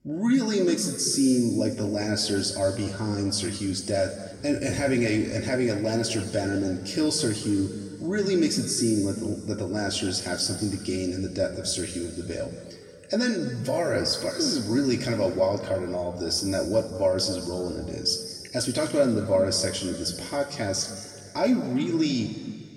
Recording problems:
off-mic speech; far
room echo; noticeable; dies away in 2 s

